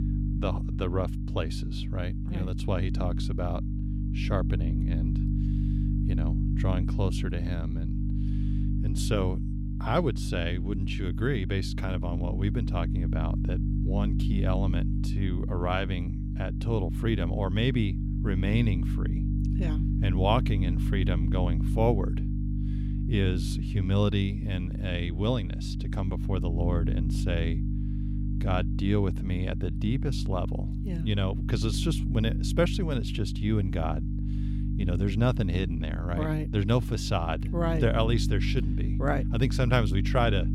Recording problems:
electrical hum; loud; throughout; 50 Hz, 8 dB below the speech

